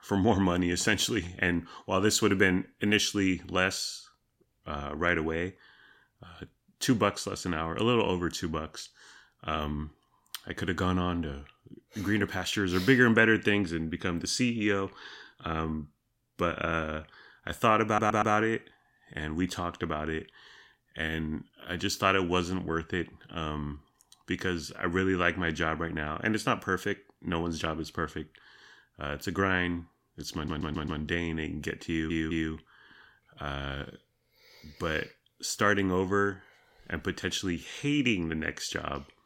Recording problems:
audio stuttering; at 18 s, at 30 s and at 32 s

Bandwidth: 16.5 kHz